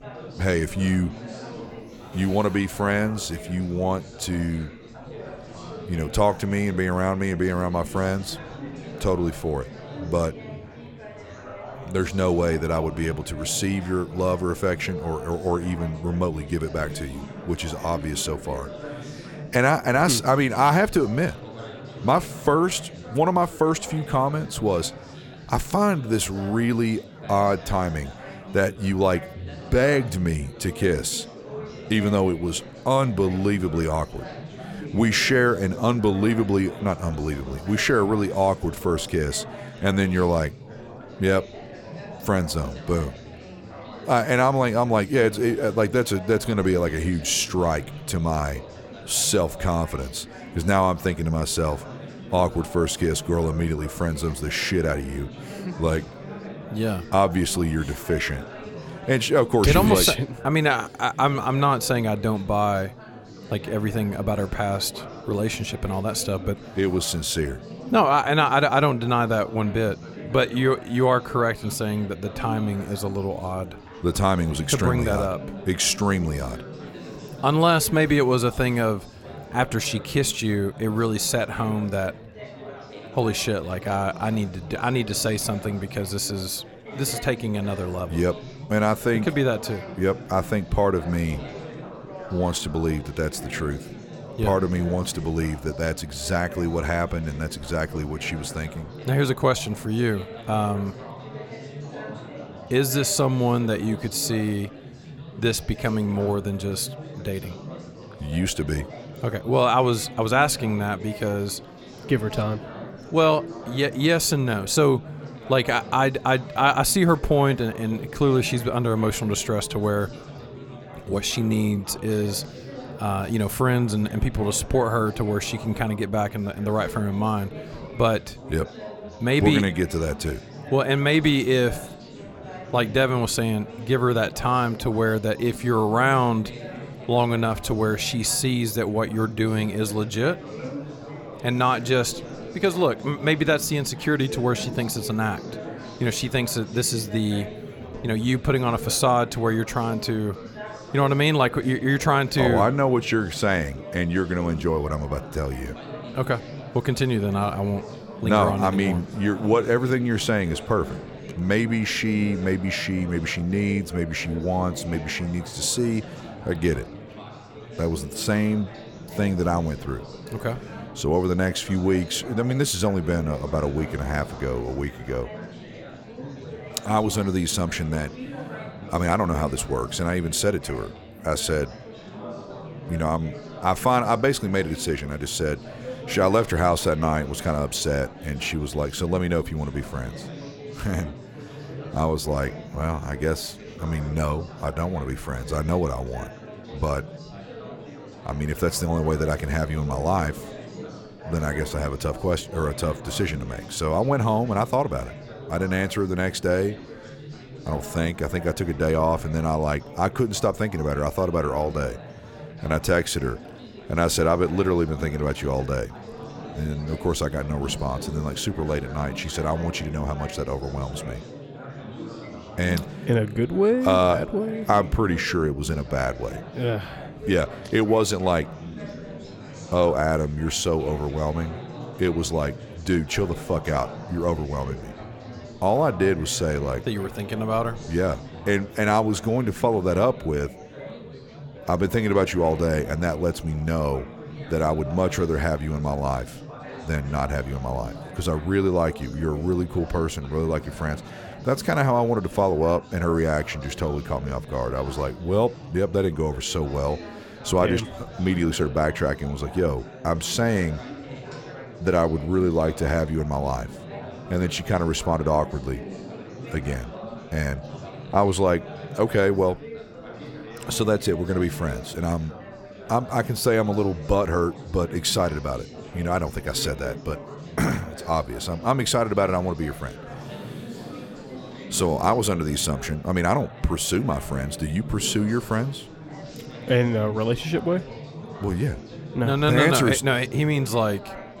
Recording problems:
chatter from many people; noticeable; throughout; 15 dB below the speech

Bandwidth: 17 kHz